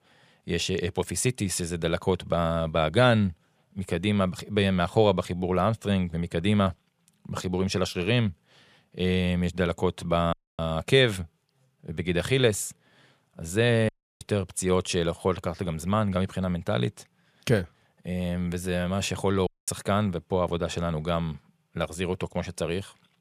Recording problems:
audio cutting out; at 10 s, at 14 s and at 19 s

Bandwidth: 15 kHz